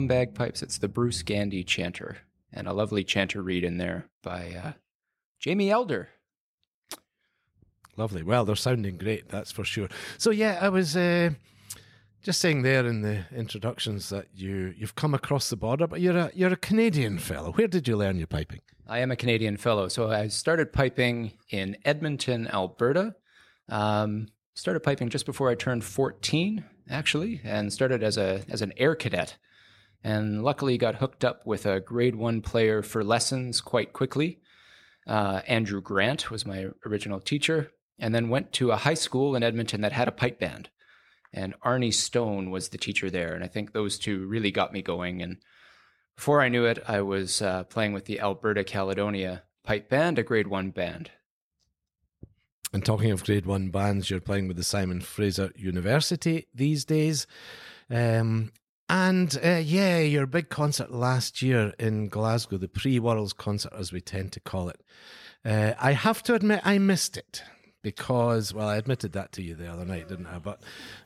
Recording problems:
abrupt cut into speech; at the start

